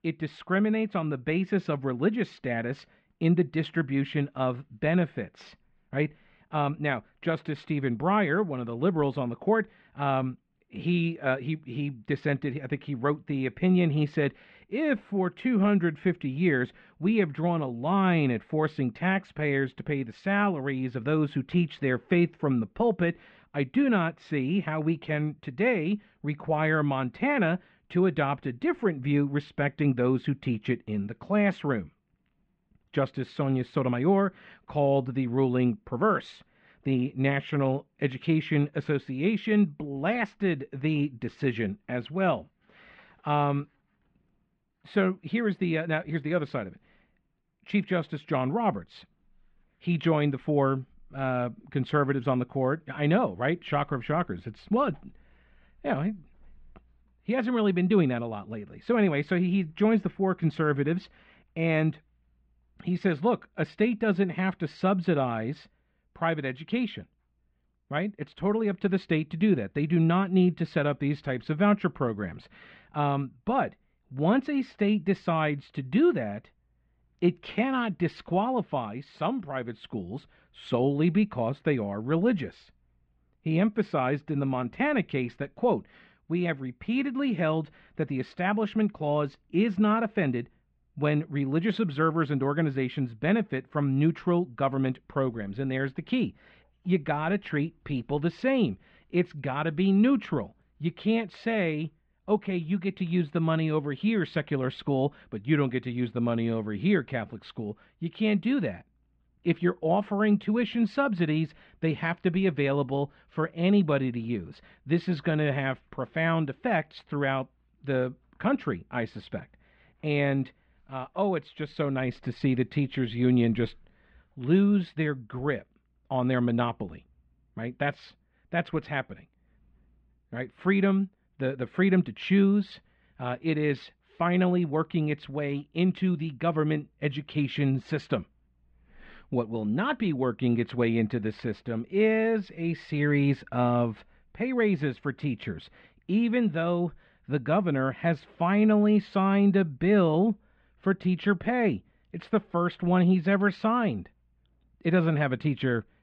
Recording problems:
muffled; very; fading above 3 kHz

